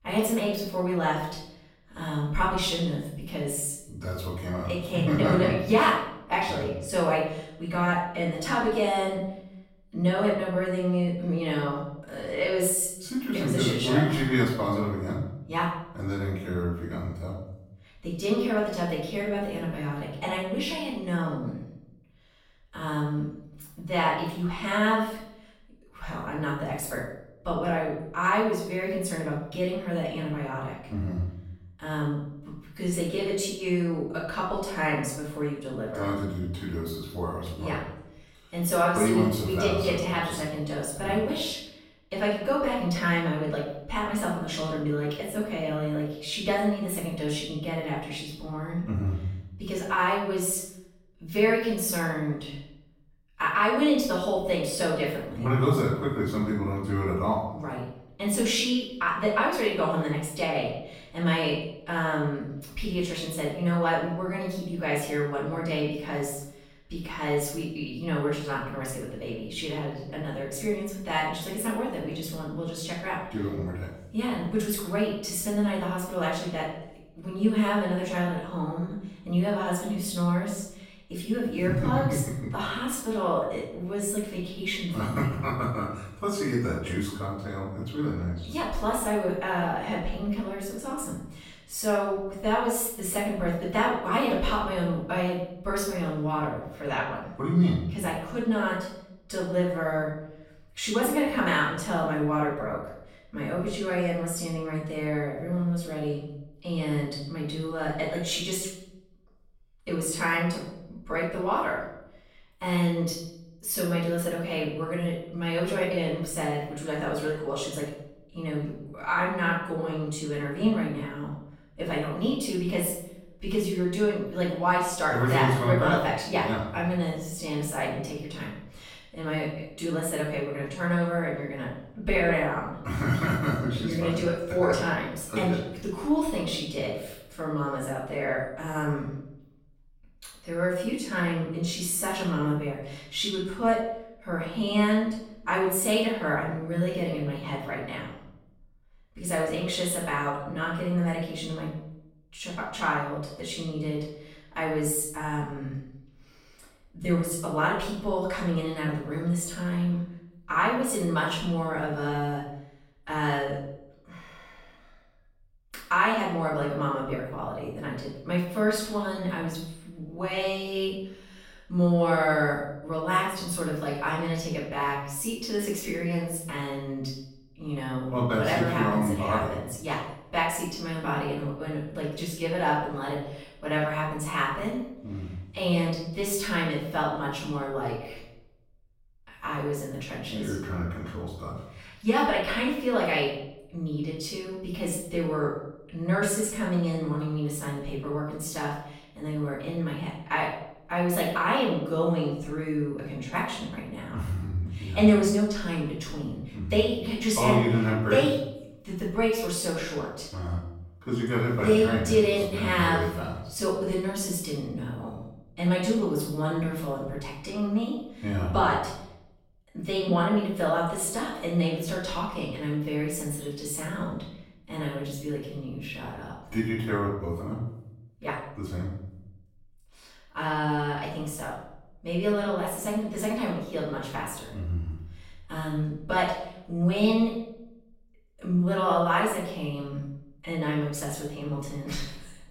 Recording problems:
off-mic speech; far
room echo; noticeable; dies away in 0.7 s

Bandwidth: 16.5 kHz